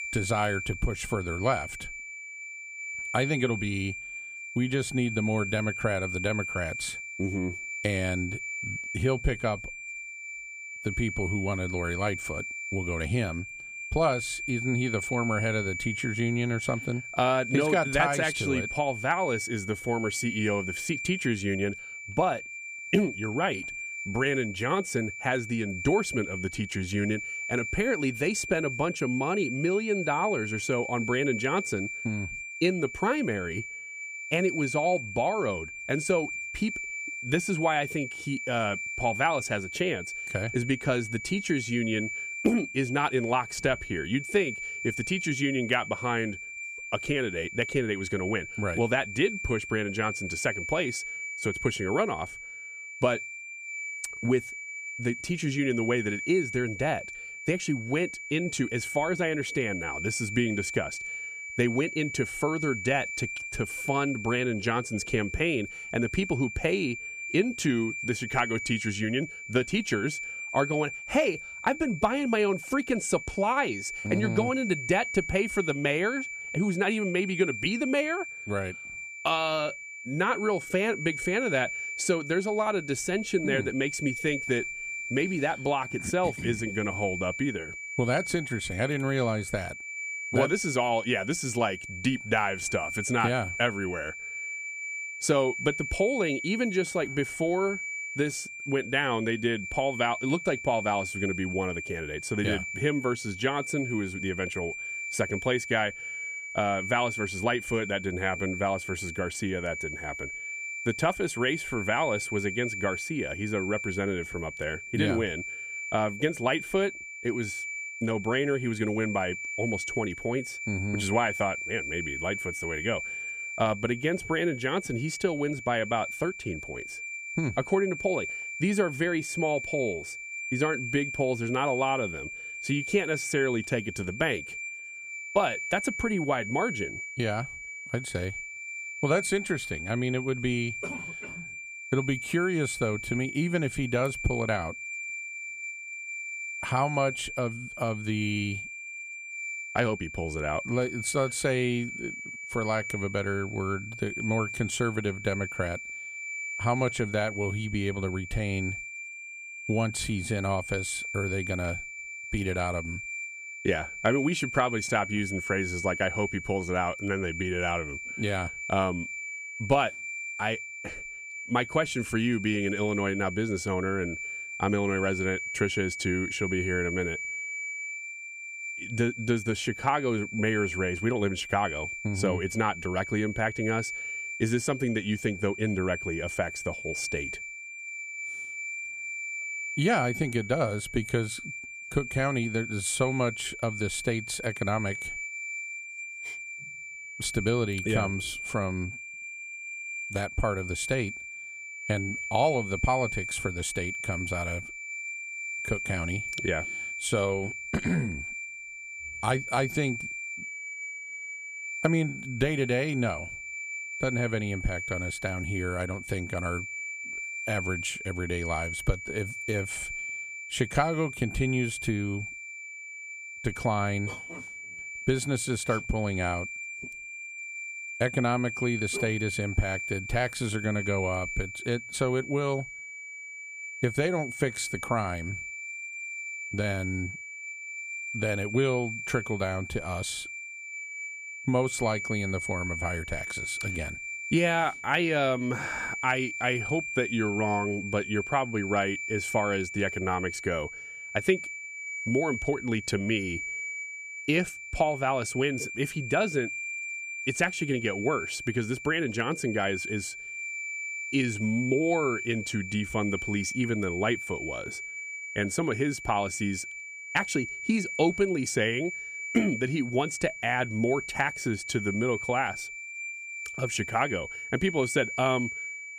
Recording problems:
high-pitched whine; loud; throughout; 2.5 kHz, 6 dB below the speech

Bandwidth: 15 kHz